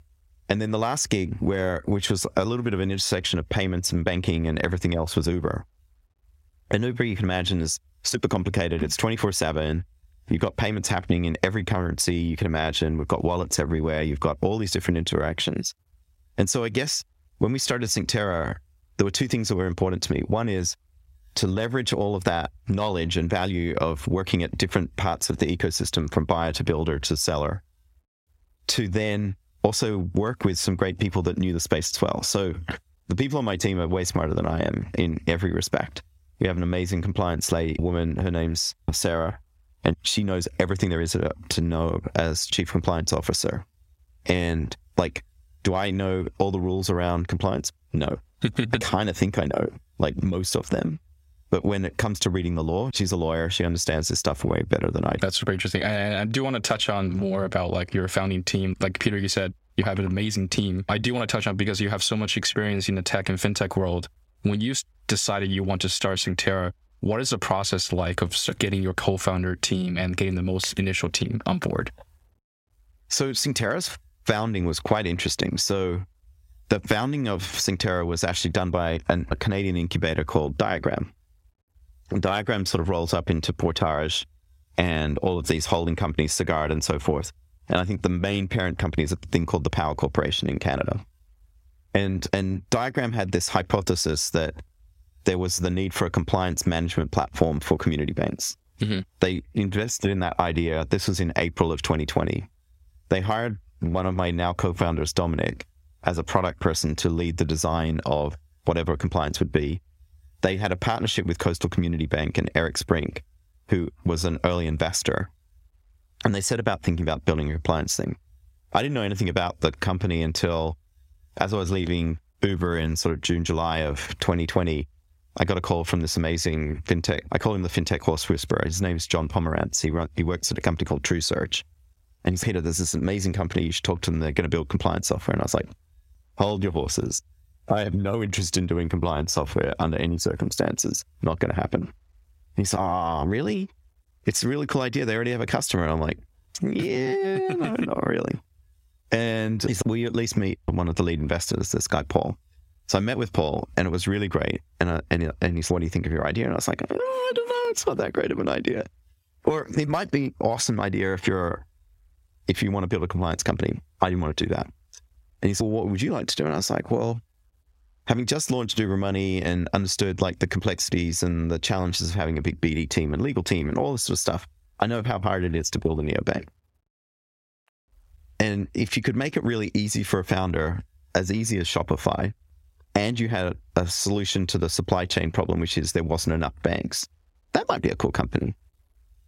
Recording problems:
squashed, flat; somewhat

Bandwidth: 16 kHz